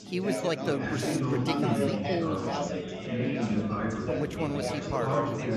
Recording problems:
chatter from many people; very loud; throughout; 3 dB above the speech

